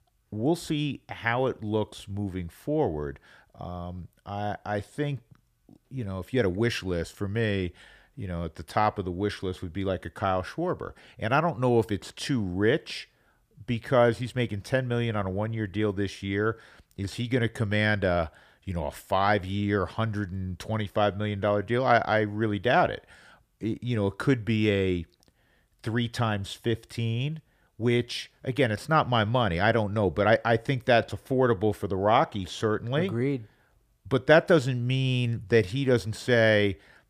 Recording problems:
none

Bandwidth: 15 kHz